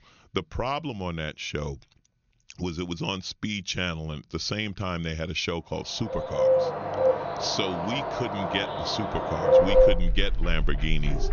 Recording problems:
high frequencies cut off; noticeable; nothing above 6.5 kHz
animal sounds; very loud; from 6.5 s on; 5 dB above the speech

